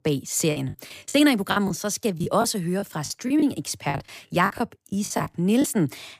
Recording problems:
choppy; very; 12% of the speech affected

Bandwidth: 15 kHz